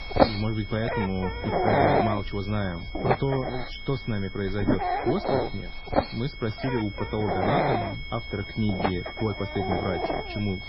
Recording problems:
garbled, watery; badly; nothing above 5.5 kHz
animal sounds; very loud; throughout; 2 dB above the speech
high-pitched whine; loud; throughout; 2 kHz, 10 dB below the speech

